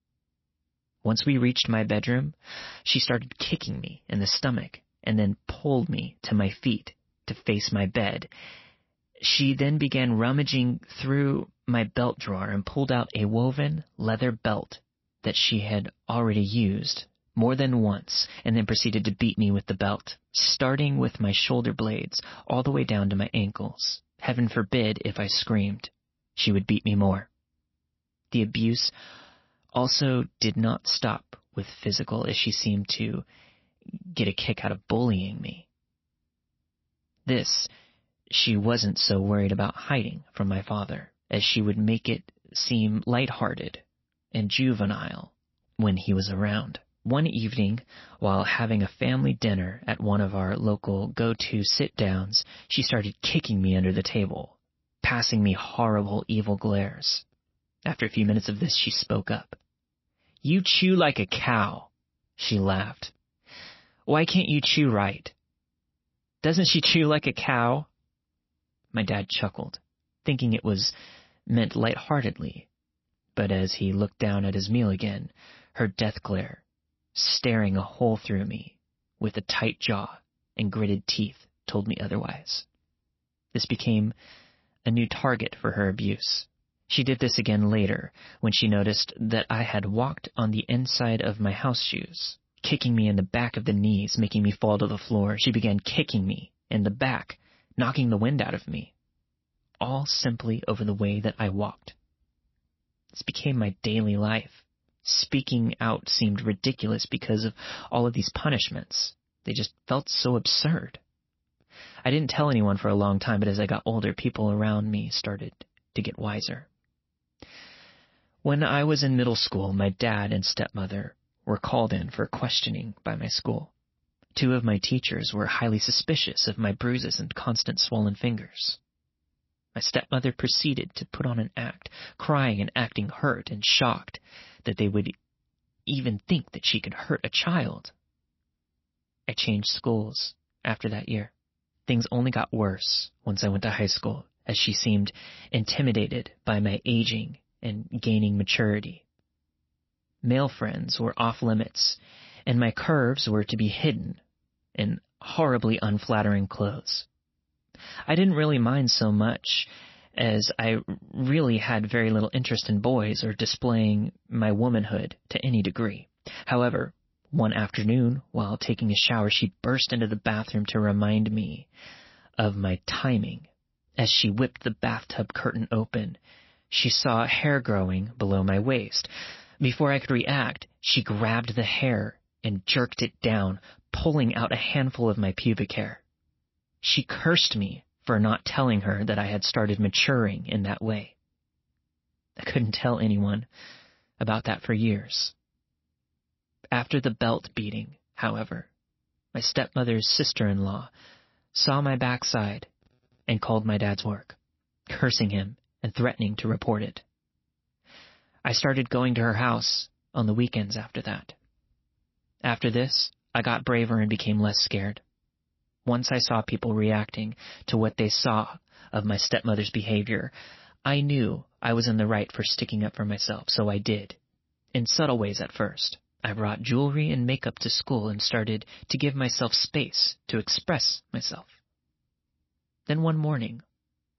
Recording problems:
garbled, watery; slightly; nothing above 5.5 kHz

